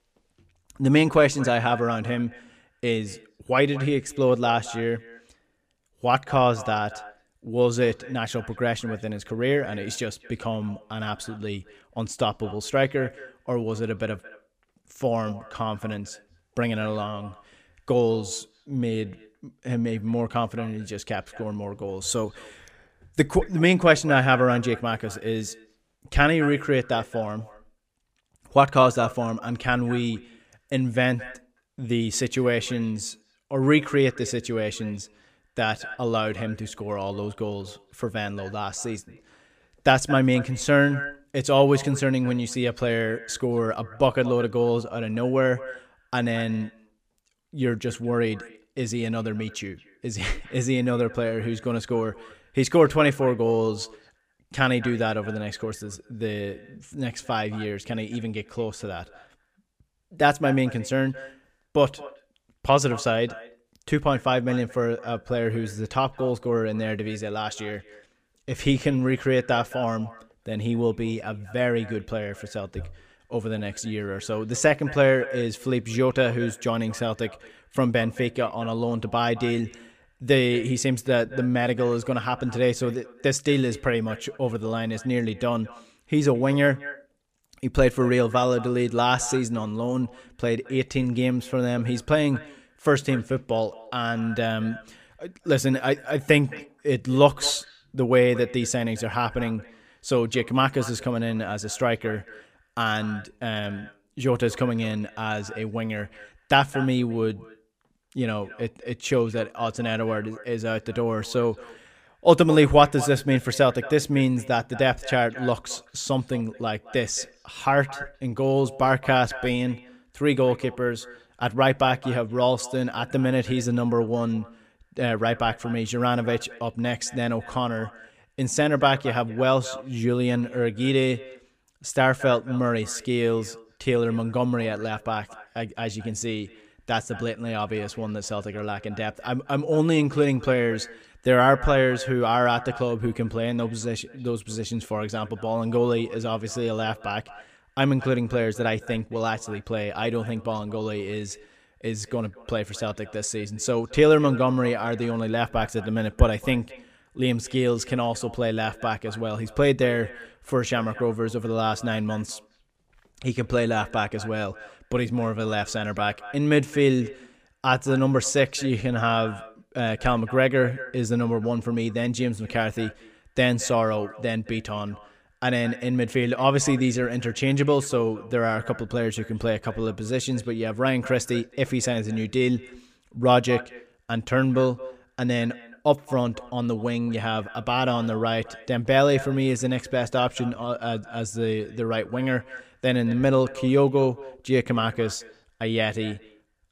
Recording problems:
echo of what is said; faint; throughout; 220 ms later, 20 dB below the speech

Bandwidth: 15 kHz